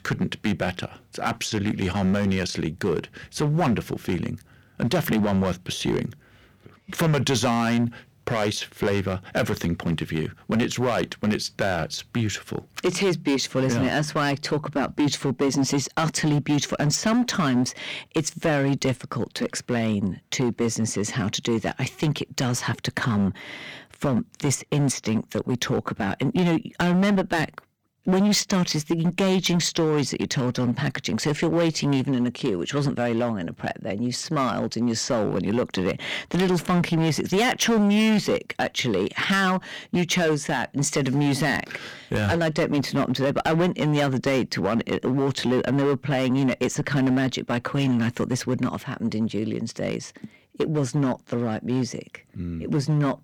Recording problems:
distortion; slight; 9% of the sound clipped

